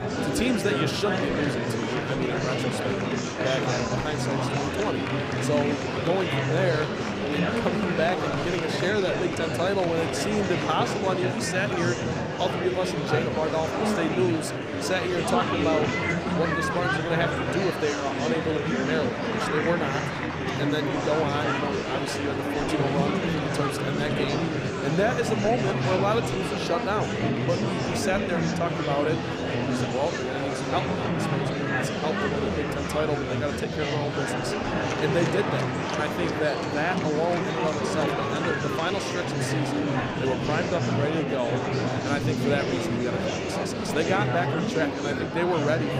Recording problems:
murmuring crowd; very loud; throughout; 2 dB above the speech

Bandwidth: 15.5 kHz